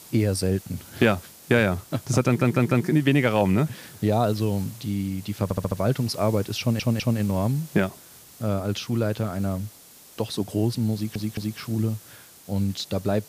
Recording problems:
hiss; noticeable; throughout; 20 dB below the speech
audio stuttering; 4 times, first at 2.5 s

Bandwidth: 15 kHz